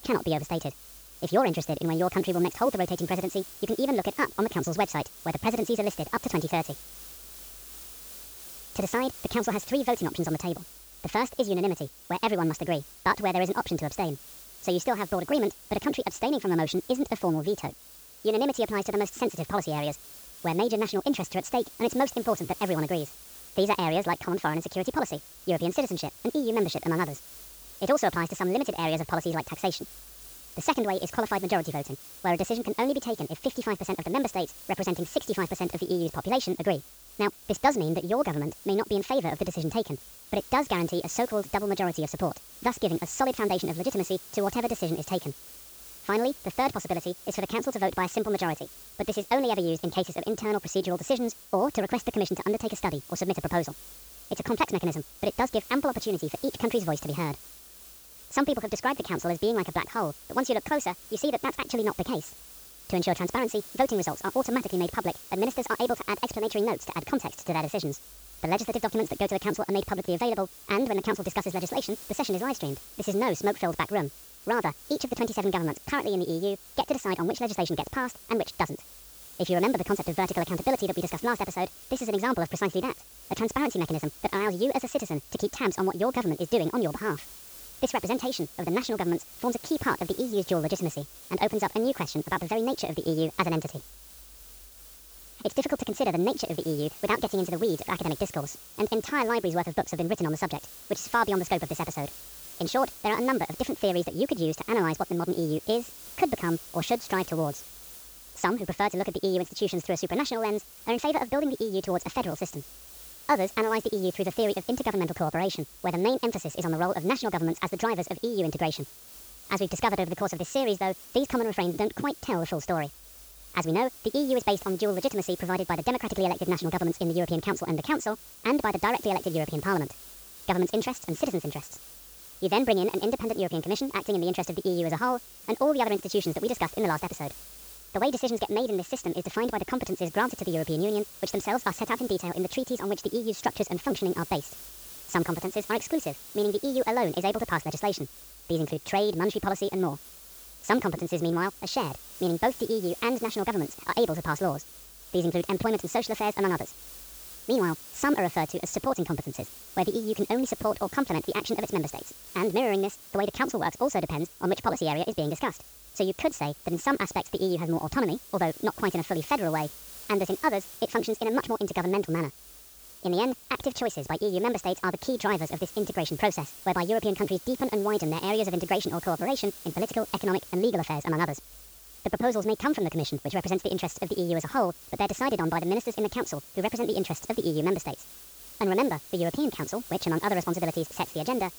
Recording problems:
wrong speed and pitch; too fast and too high; 1.5 times normal speed
high frequencies cut off; noticeable; nothing above 8 kHz
hiss; noticeable; throughout; 15 dB below the speech

